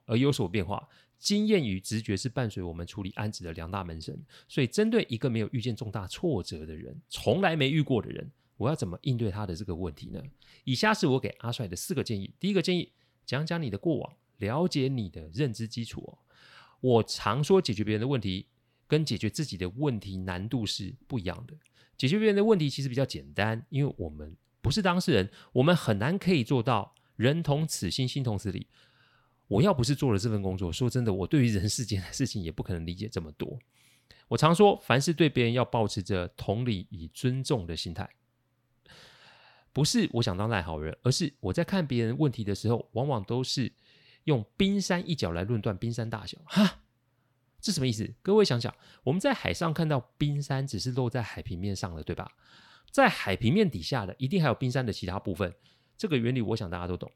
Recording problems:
none

